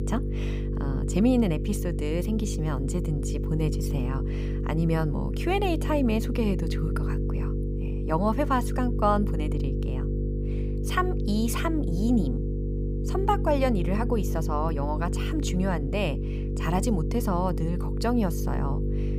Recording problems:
electrical hum; loud; throughout; 50 Hz, 8 dB below the speech

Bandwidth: 15.5 kHz